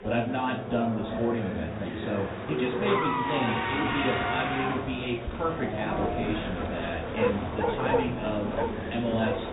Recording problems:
off-mic speech; far
high frequencies cut off; severe; nothing above 4 kHz
room echo; slight; dies away in 0.4 s
animal sounds; loud; throughout; 1 dB below the speech
traffic noise; loud; throughout; as loud as the speech
murmuring crowd; loud; throughout; 2 dB below the speech

